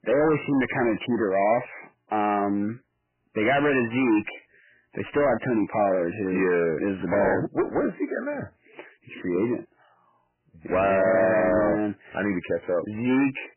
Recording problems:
distortion; heavy; 7 dB below the speech
garbled, watery; badly; nothing above 3 kHz

